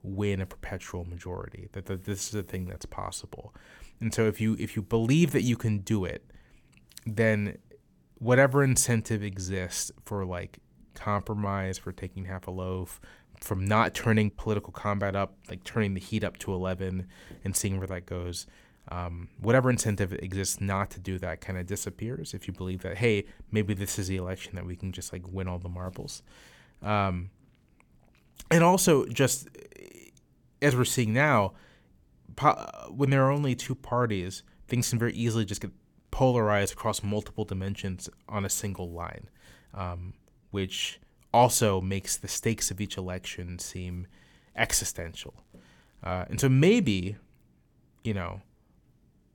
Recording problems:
uneven, jittery; strongly; from 2 to 41 s

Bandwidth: 18.5 kHz